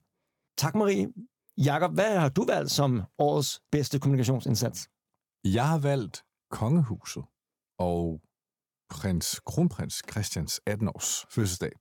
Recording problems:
none

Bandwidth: 17.5 kHz